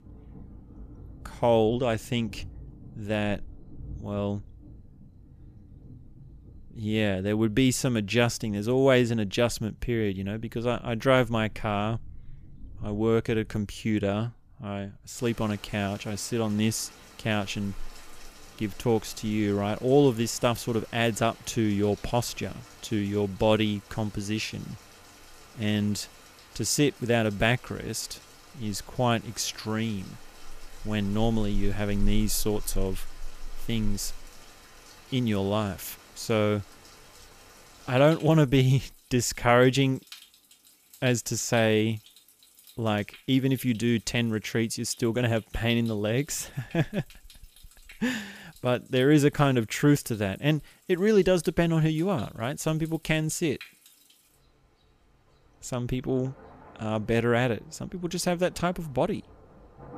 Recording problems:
rain or running water; faint; throughout; 20 dB below the speech

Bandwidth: 15 kHz